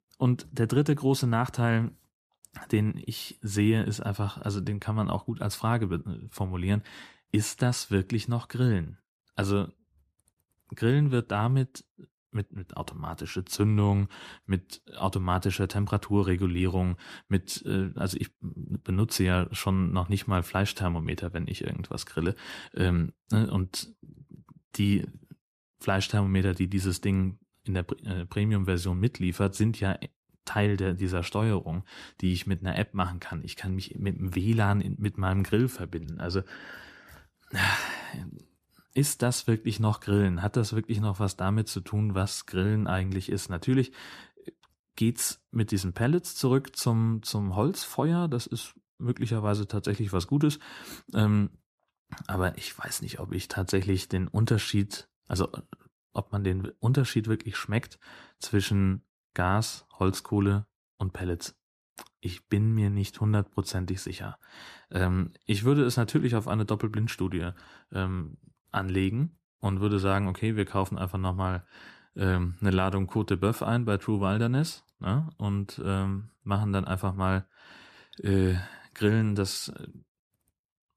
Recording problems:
none

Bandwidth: 14.5 kHz